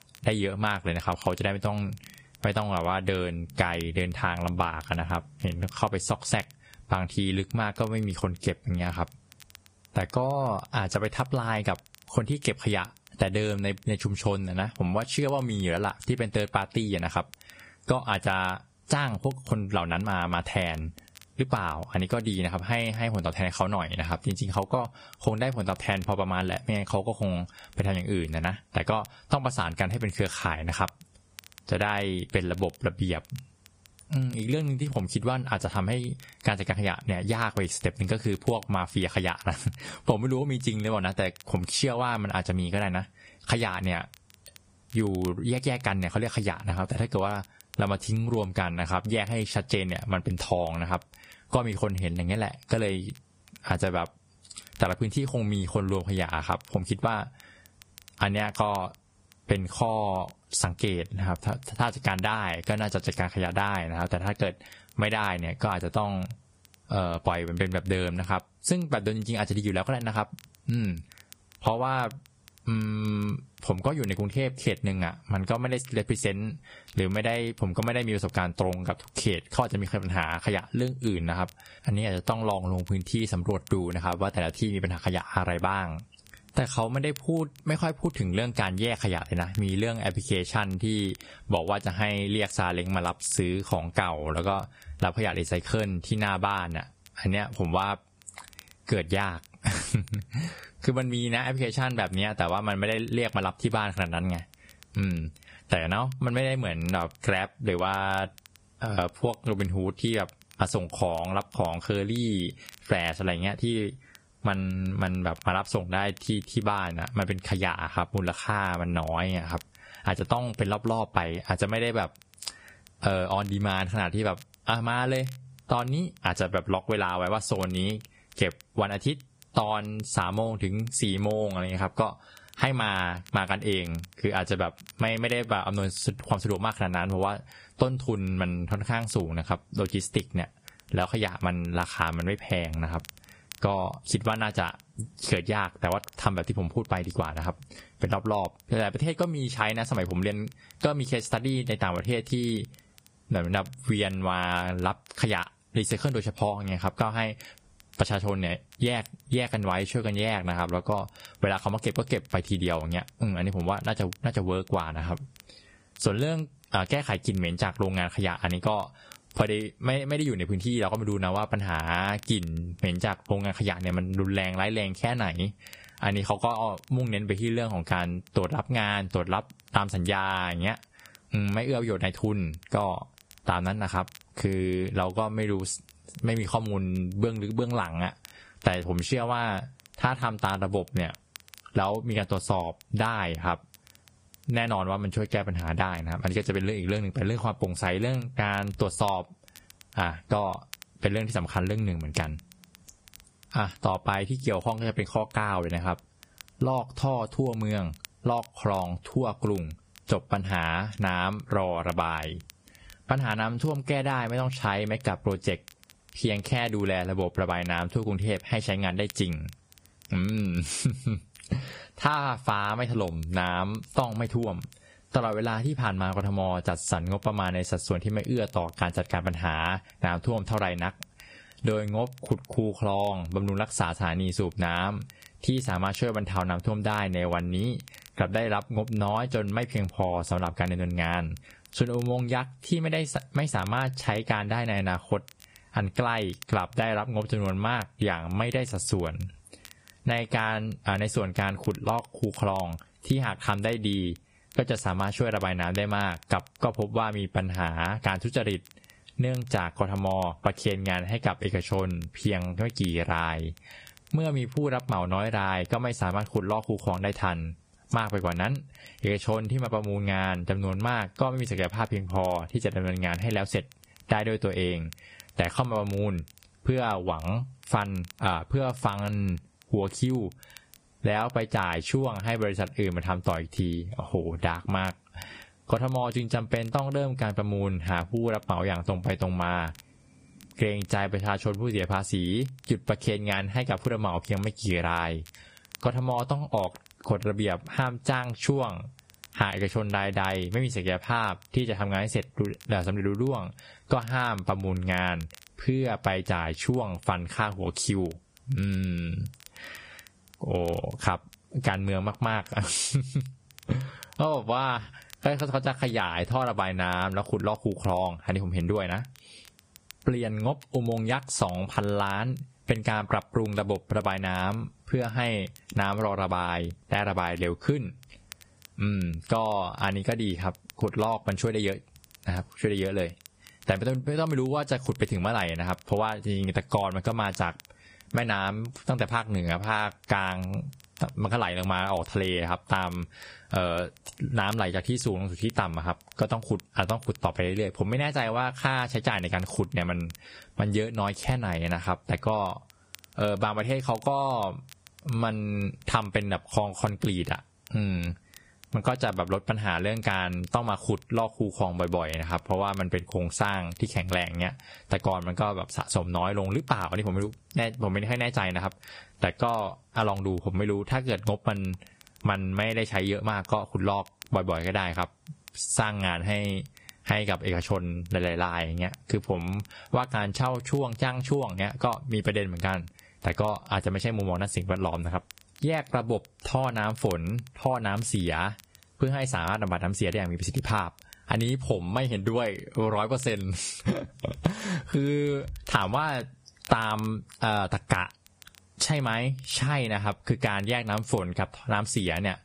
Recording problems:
garbled, watery; badly; nothing above 10 kHz
squashed, flat; somewhat
crackle, like an old record; faint; 25 dB below the speech

